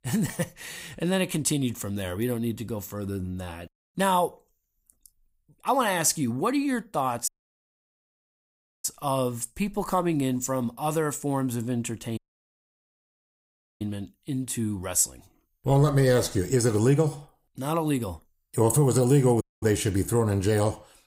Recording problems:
audio cutting out; at 7.5 s for 1.5 s, at 12 s for 1.5 s and at 19 s

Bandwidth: 15.5 kHz